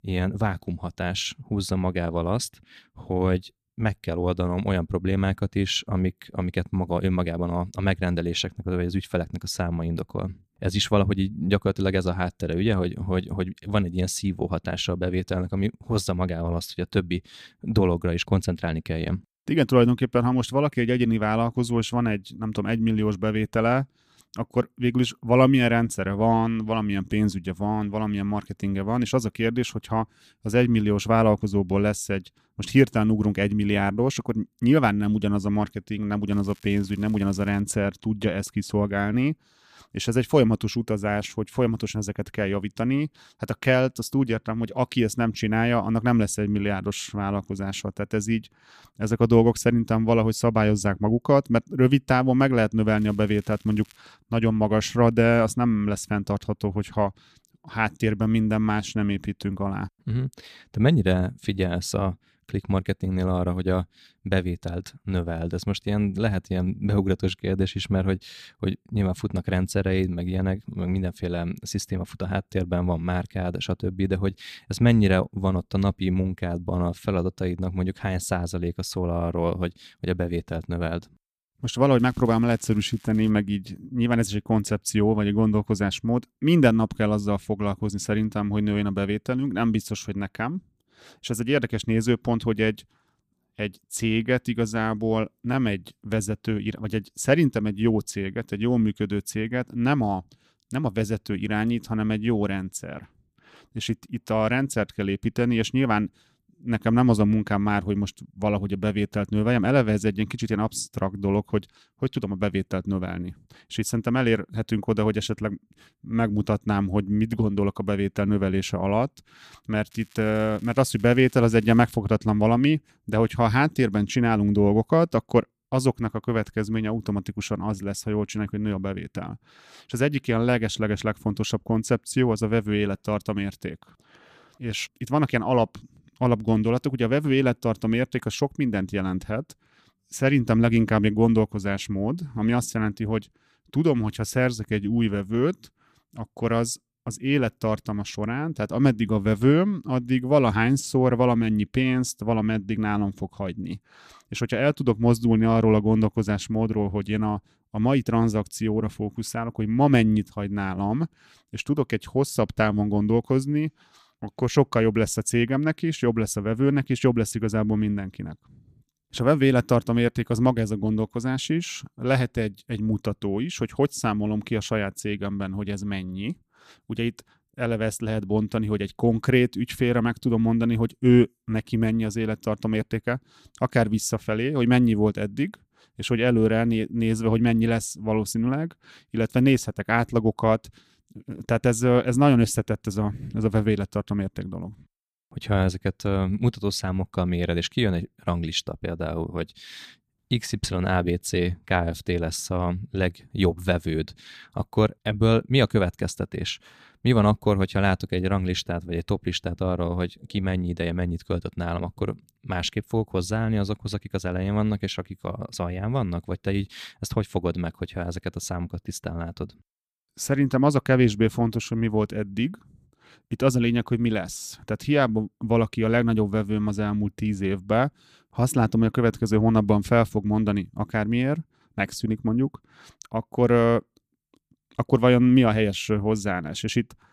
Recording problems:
crackling; faint; 4 times, first at 36 s; 30 dB below the speech

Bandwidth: 14.5 kHz